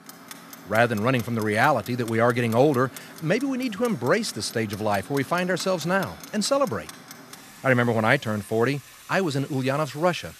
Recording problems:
household noises; noticeable; throughout; 20 dB below the speech

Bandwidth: 14 kHz